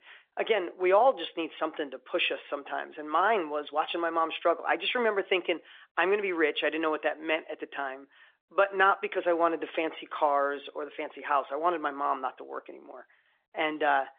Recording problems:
phone-call audio; nothing above 3.5 kHz

